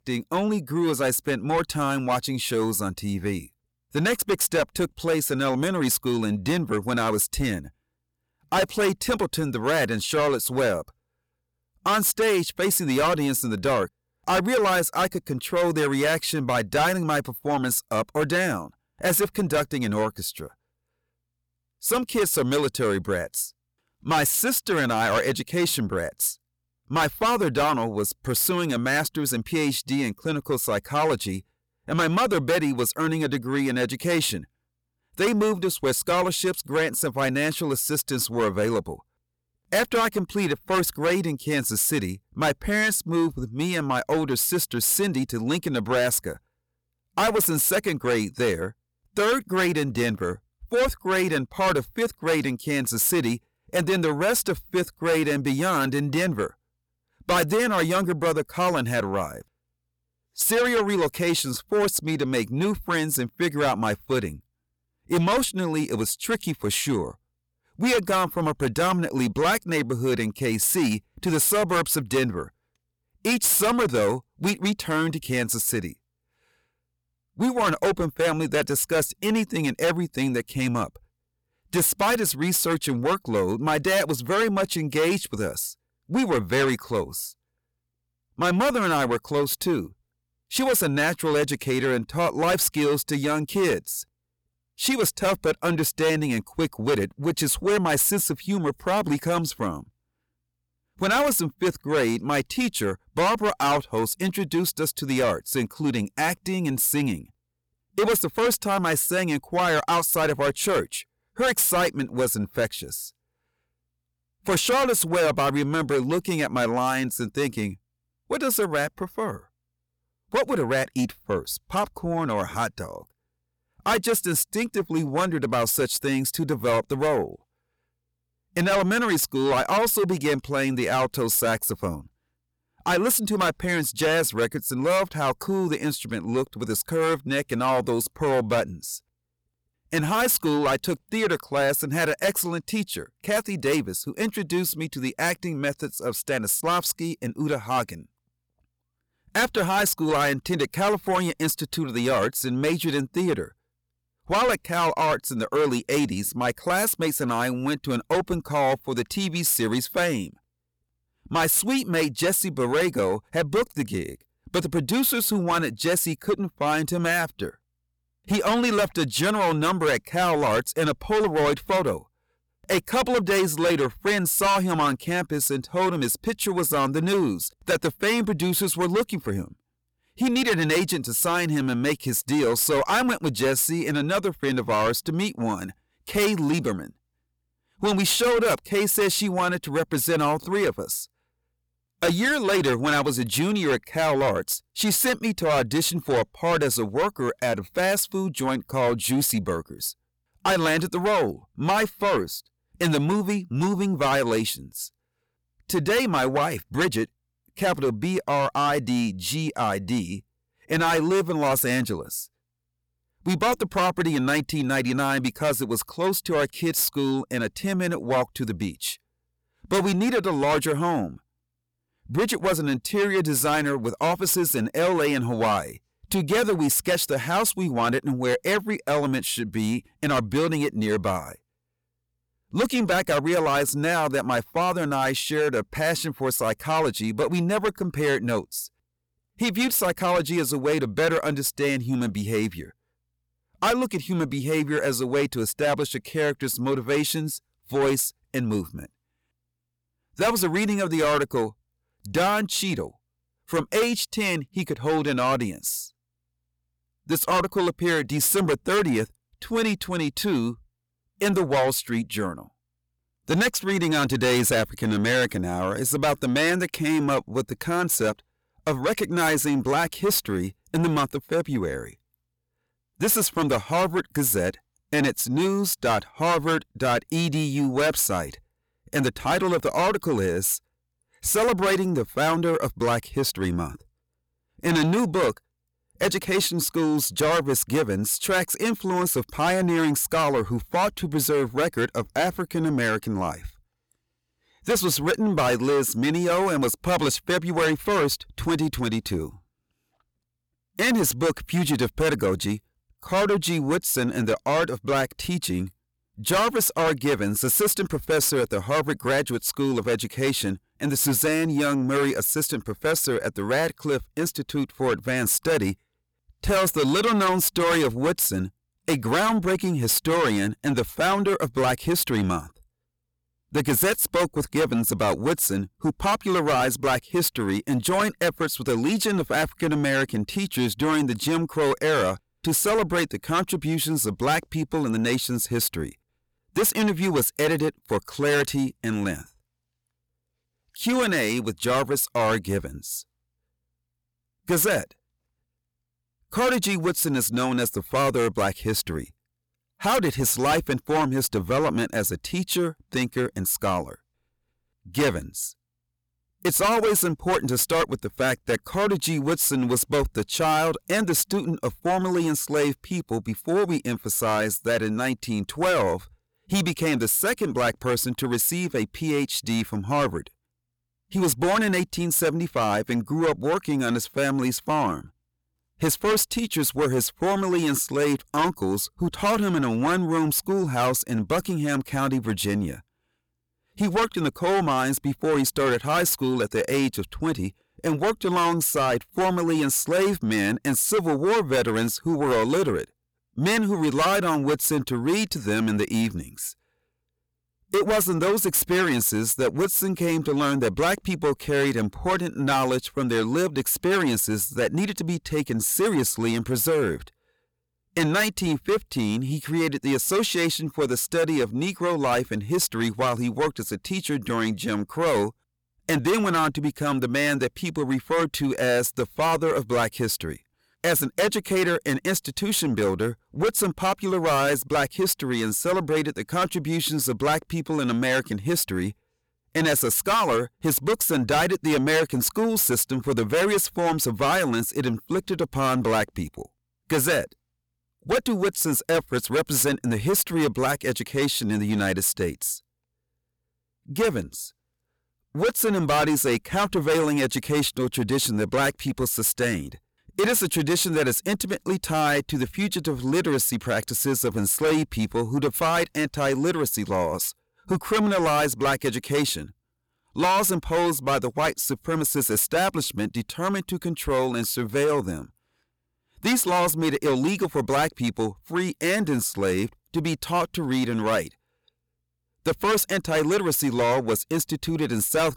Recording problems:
distortion; heavy; 6 dB below the speech

